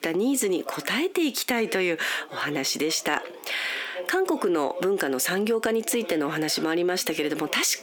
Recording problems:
squashed, flat; heavily, background pumping
thin; very slightly; fading below 250 Hz
voice in the background; noticeable; throughout; 20 dB below the speech

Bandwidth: 18.5 kHz